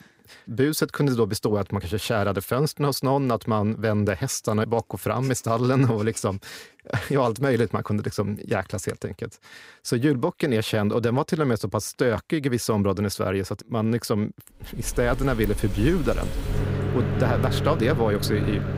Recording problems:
household noises; loud; from 15 s on; 4 dB below the speech

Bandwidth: 15.5 kHz